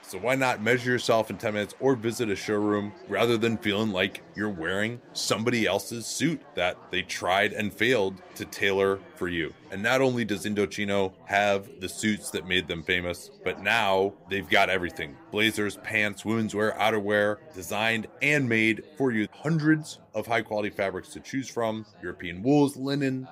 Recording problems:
chatter from many people; faint; throughout; 25 dB below the speech

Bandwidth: 15.5 kHz